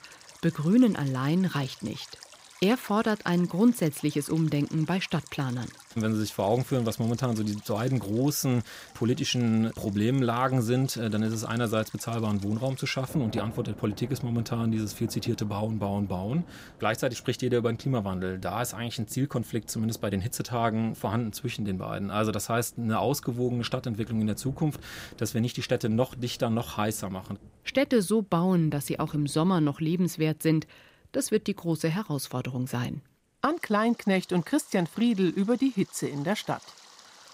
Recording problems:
rain or running water; faint; throughout; 20 dB below the speech

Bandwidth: 15.5 kHz